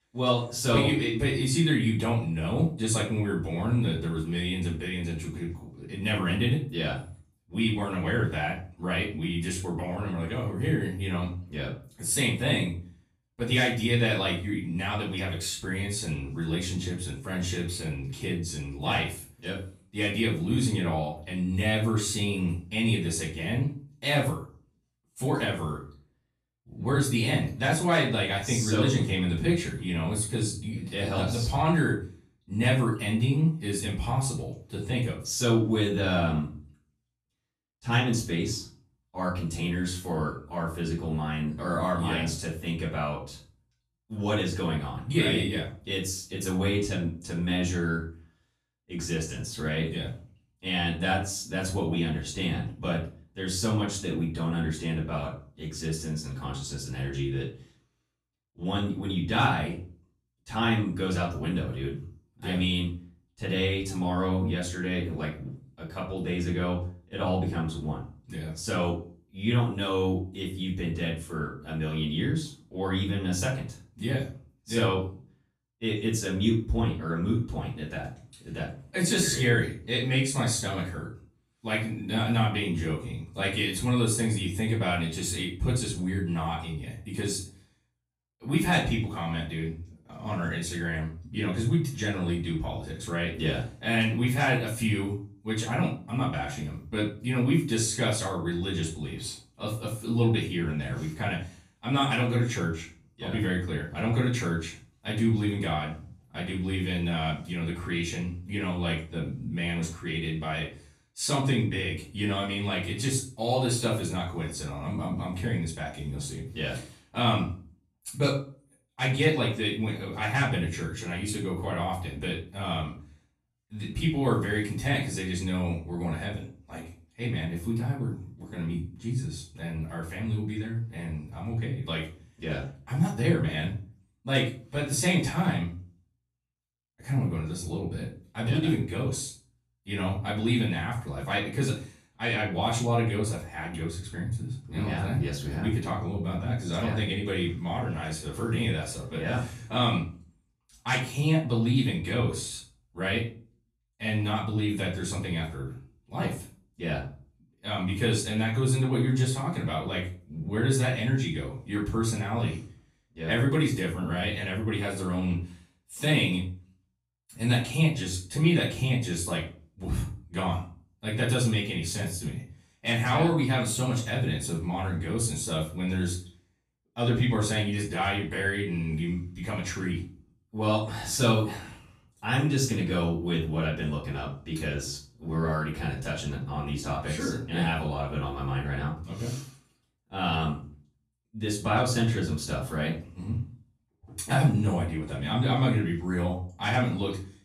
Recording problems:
off-mic speech; far
room echo; slight; dies away in 0.3 s

